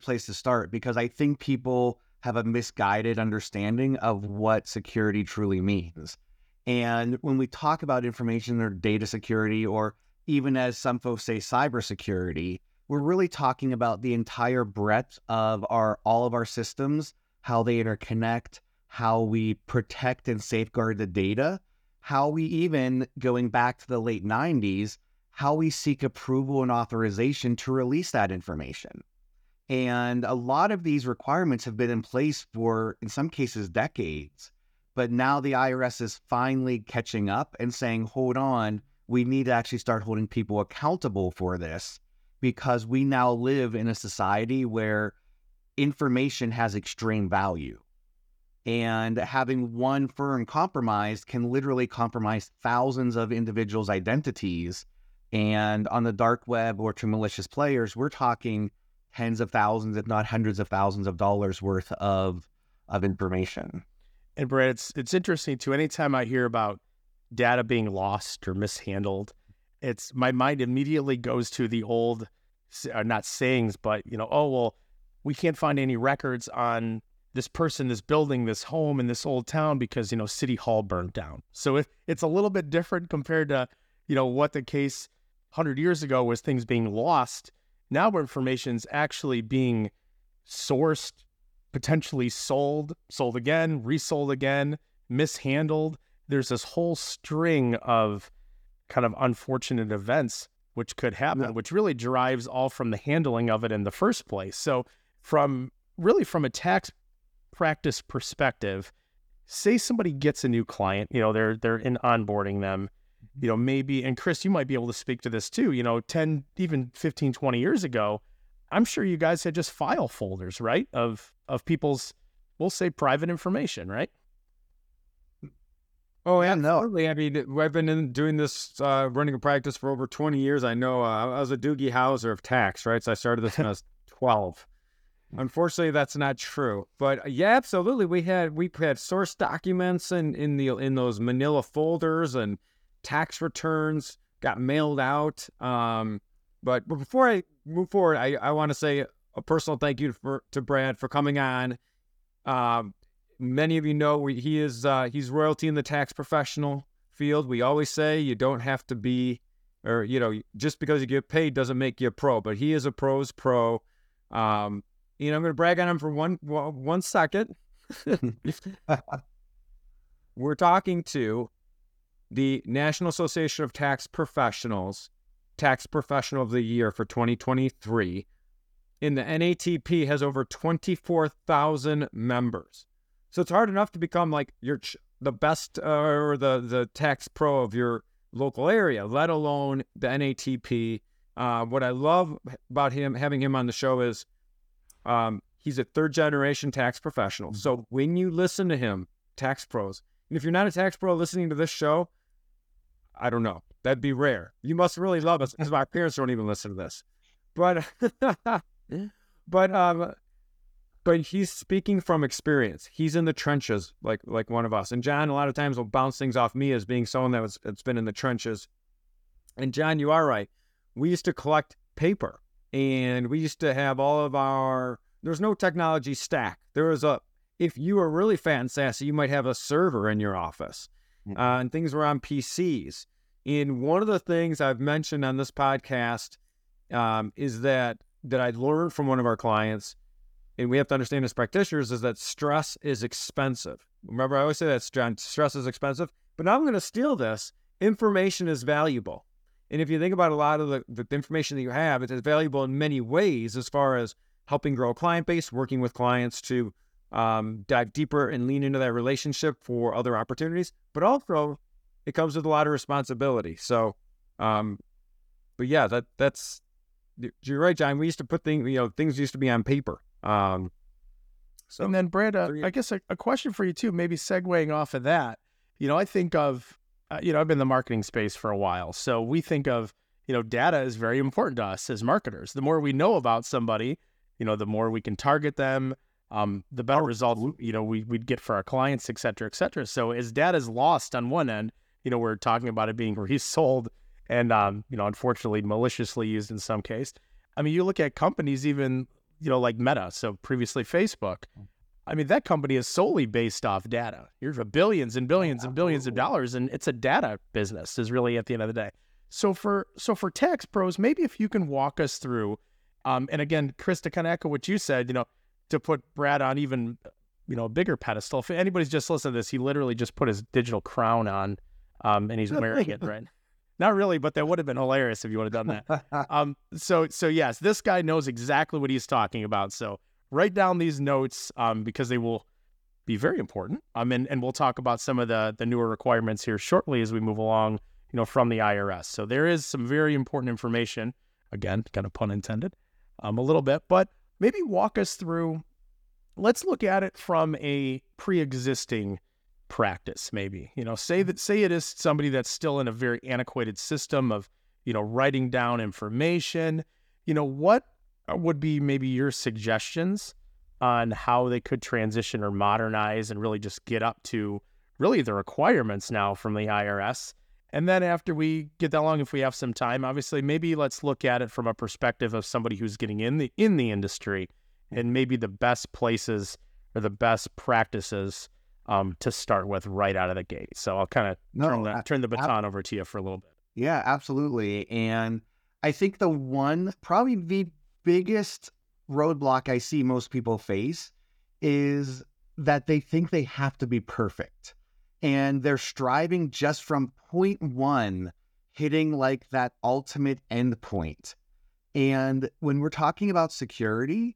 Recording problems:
none

